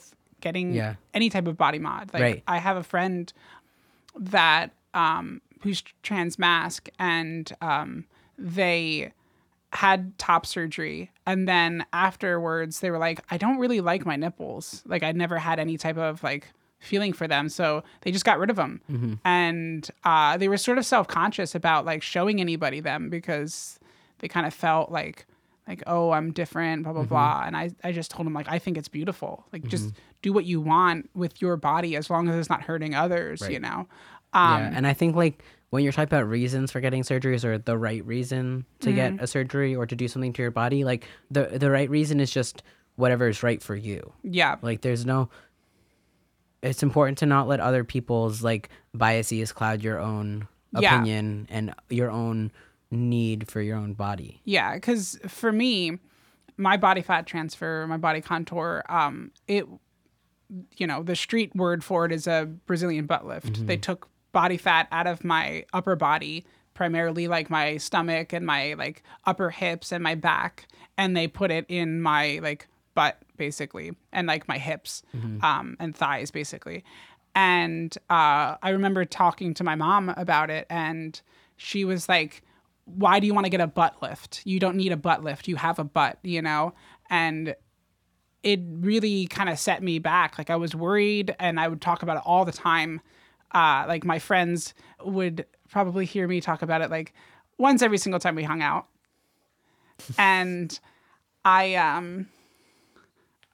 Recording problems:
none

